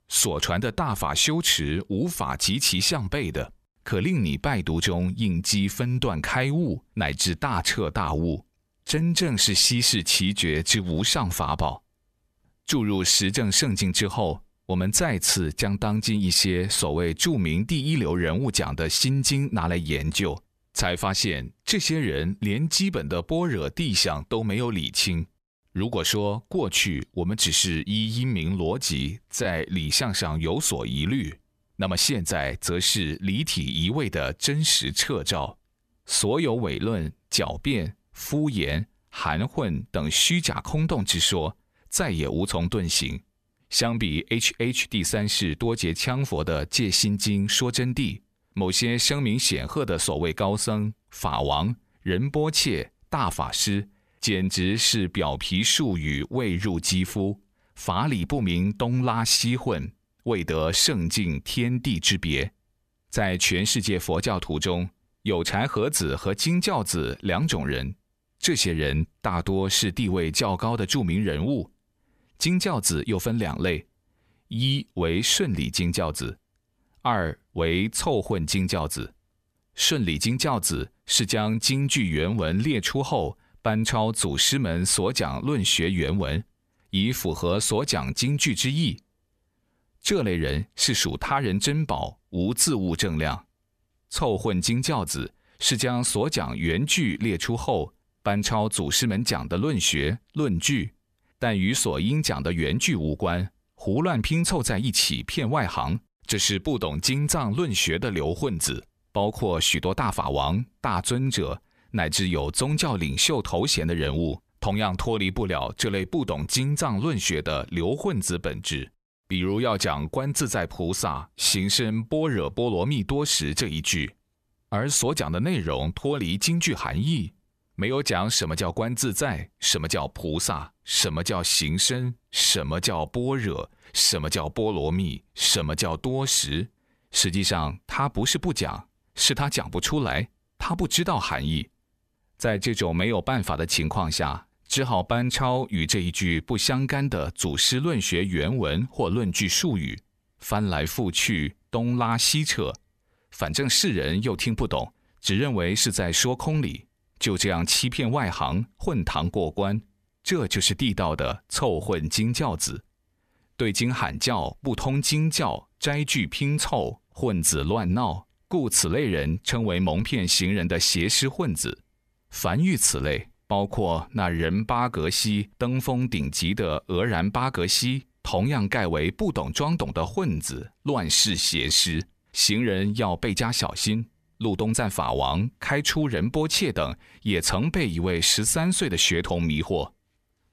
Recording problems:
uneven, jittery; strongly; from 9 s to 3:05

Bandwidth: 14.5 kHz